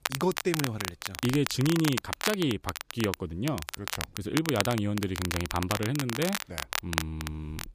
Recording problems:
crackle, like an old record; loud; 4 dB below the speech

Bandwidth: 15 kHz